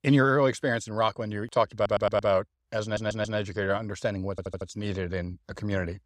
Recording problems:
audio stuttering; at 2 s, at 3 s and at 4.5 s

